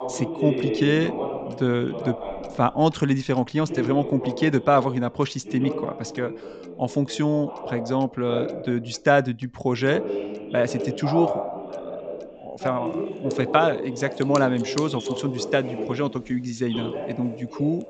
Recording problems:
high frequencies cut off; noticeable; nothing above 8 kHz
voice in the background; loud; throughout; 7 dB below the speech
household noises; faint; throughout; 25 dB below the speech

